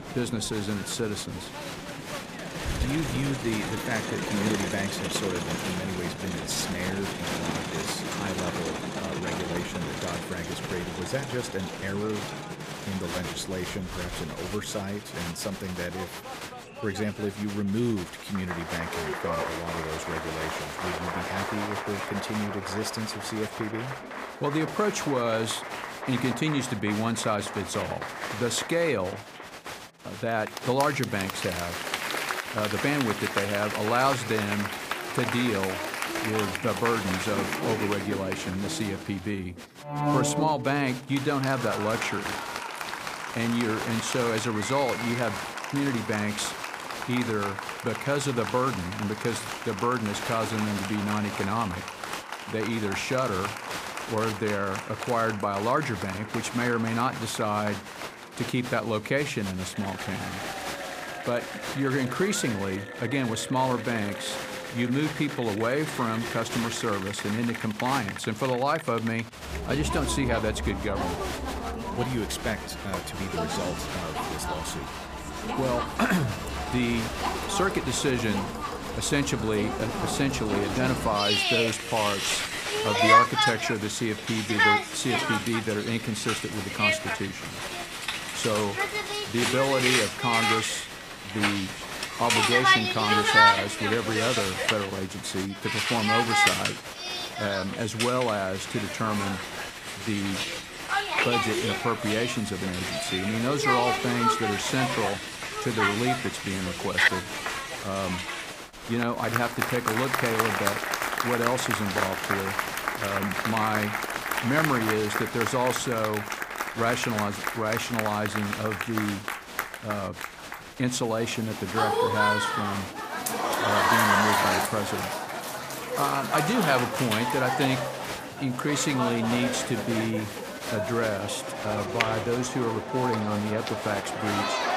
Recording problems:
crowd noise; loud; throughout; as loud as the speech

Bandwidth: 15 kHz